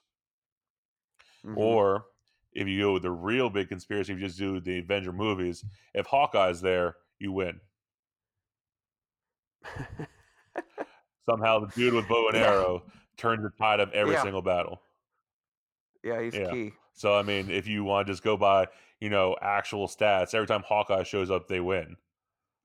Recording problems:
none

